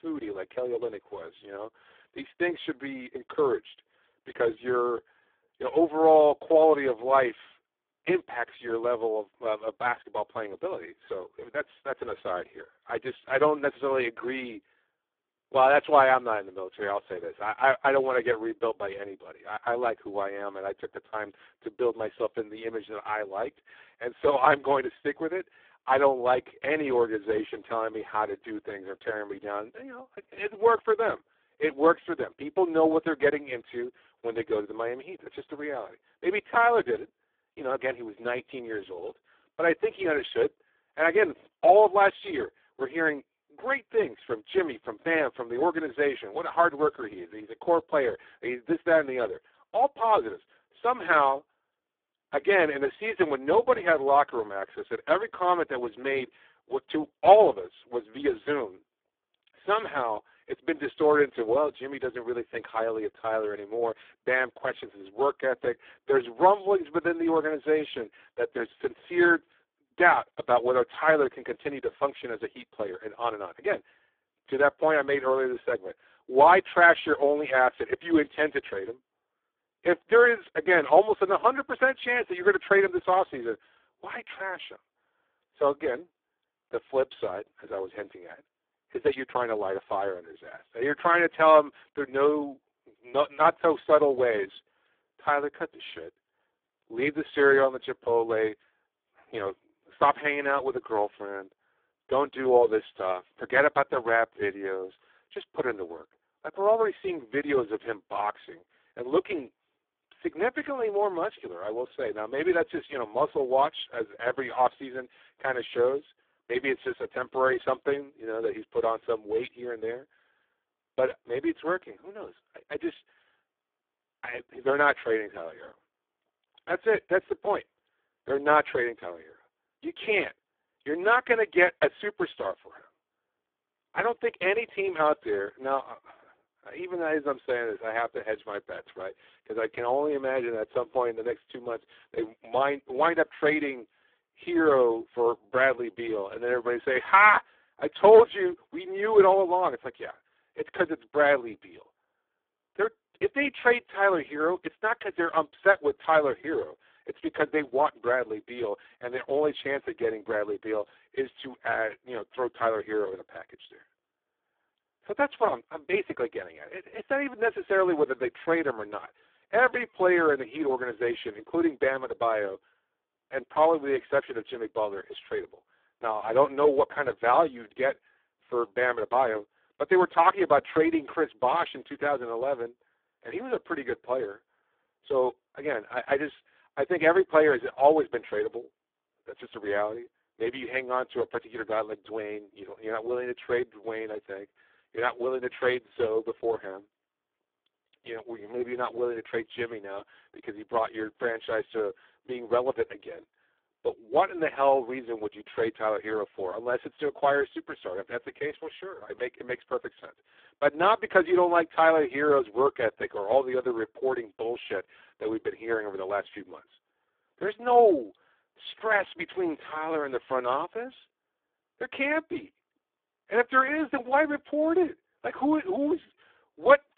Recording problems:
phone-call audio; poor line

